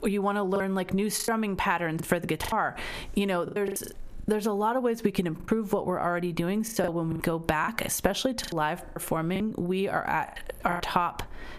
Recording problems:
squashed, flat; heavily
choppy; very; 11% of the speech affected

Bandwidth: 14.5 kHz